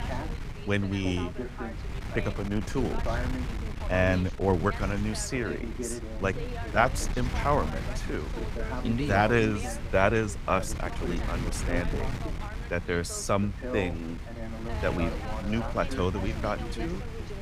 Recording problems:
background chatter; noticeable; throughout; 2 voices, 10 dB below the speech
wind noise on the microphone; occasional gusts; 15 dB below the speech

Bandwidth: 15.5 kHz